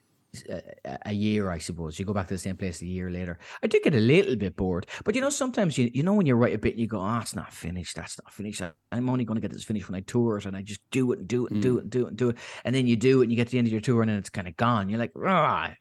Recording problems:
none

